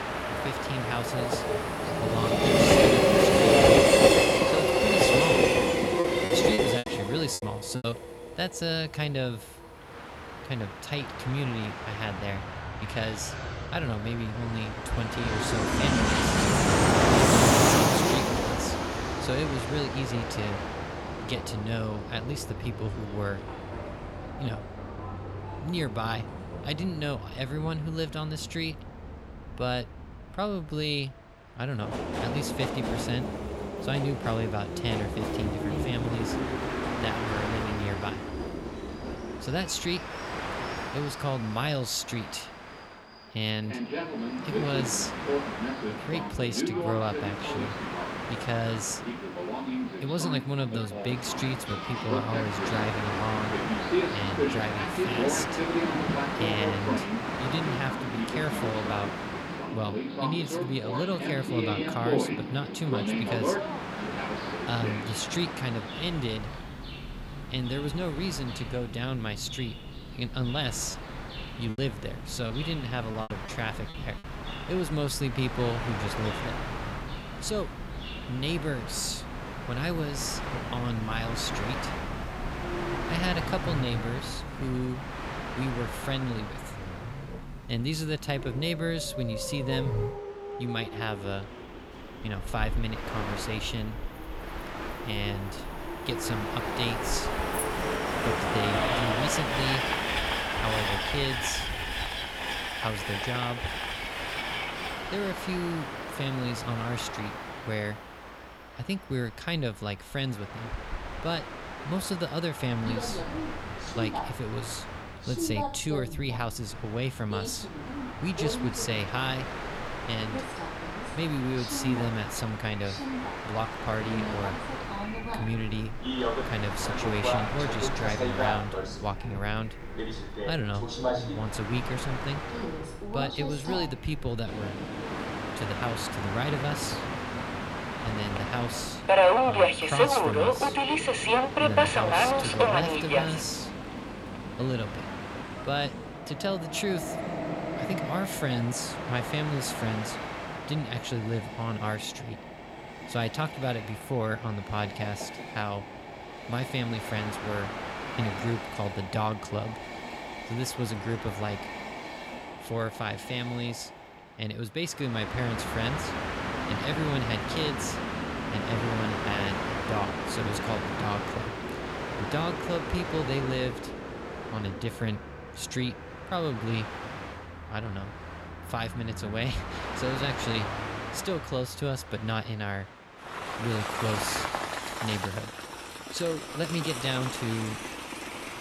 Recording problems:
train or aircraft noise; very loud; throughout; 3 dB above the speech
animal sounds; noticeable; throughout; 15 dB below the speech
choppy; very; from 6.5 to 8 s and from 1:11 to 1:14; 10% of the speech affected

